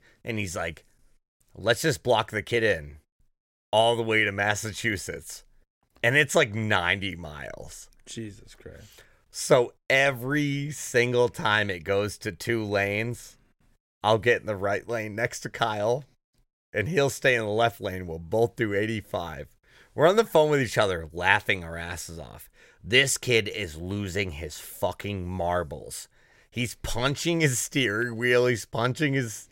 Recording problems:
none

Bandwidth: 16 kHz